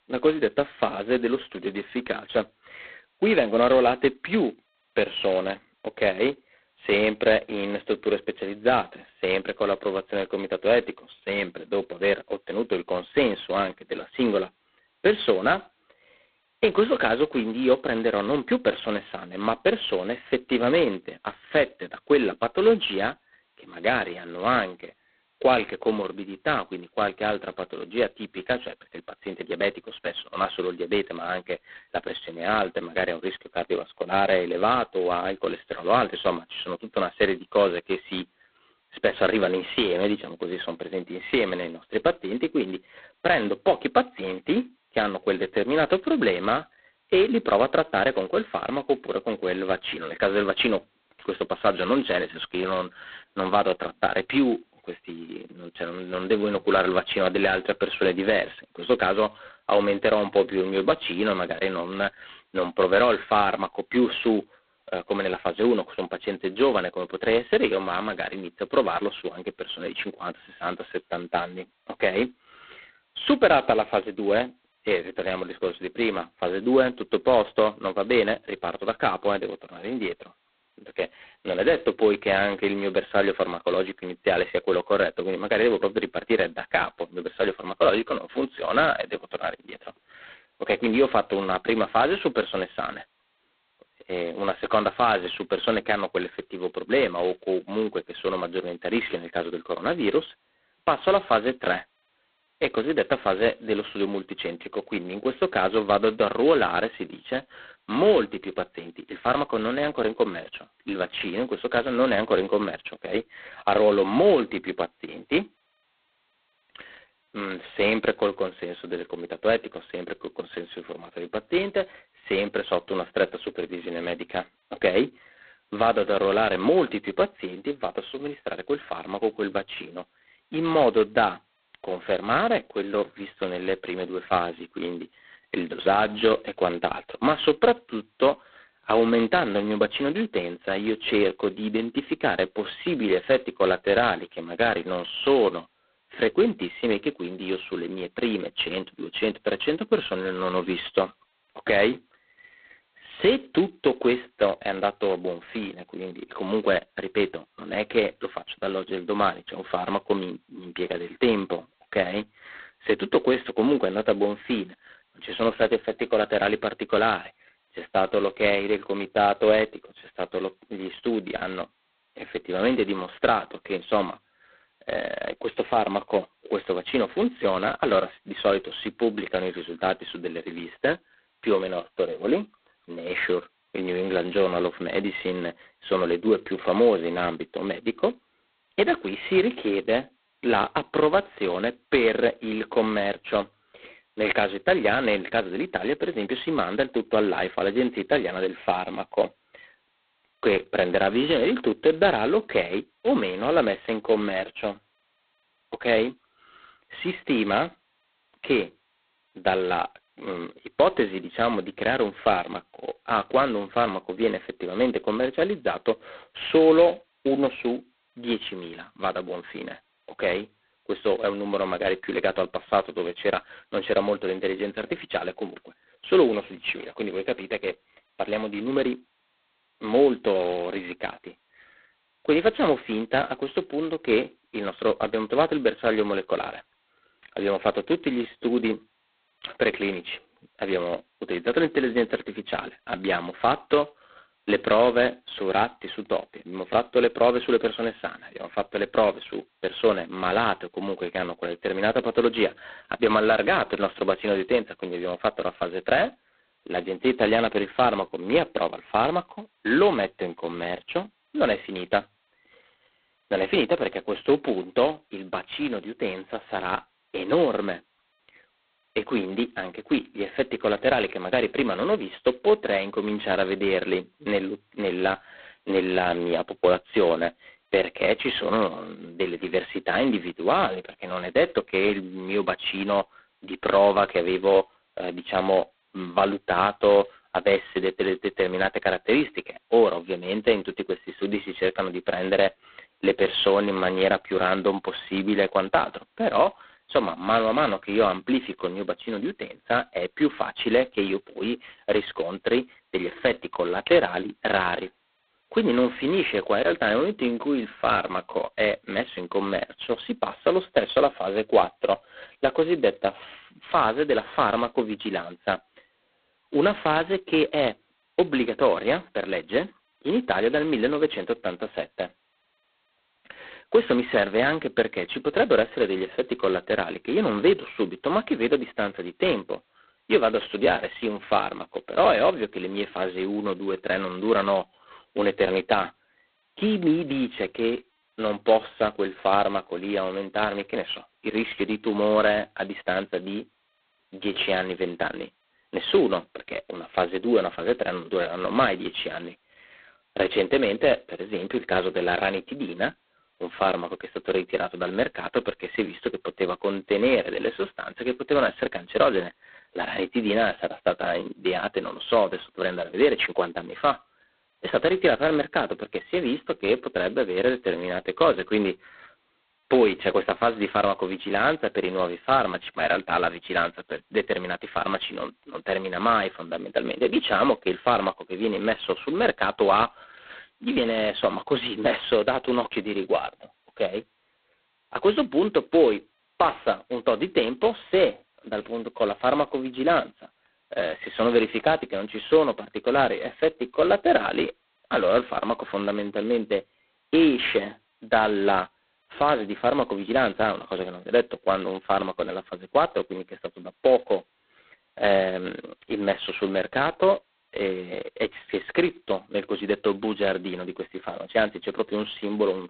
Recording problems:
phone-call audio; poor line; nothing above 4 kHz

